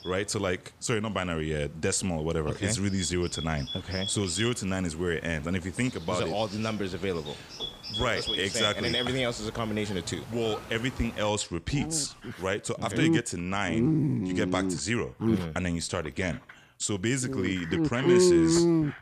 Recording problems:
animal sounds; very loud; throughout; 1 dB above the speech

